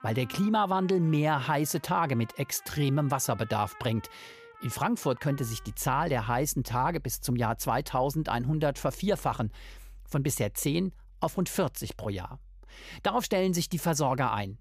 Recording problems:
background music; faint; throughout; 20 dB below the speech

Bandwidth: 15 kHz